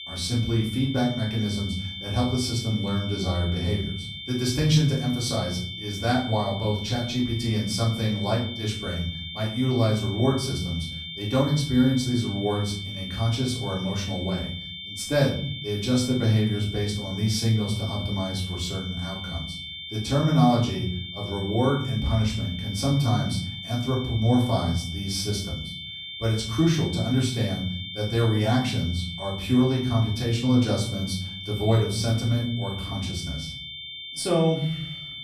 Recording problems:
off-mic speech; far
room echo; noticeable; dies away in 0.6 s
high-pitched whine; loud; throughout; 3.5 kHz, 9 dB below the speech

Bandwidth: 15 kHz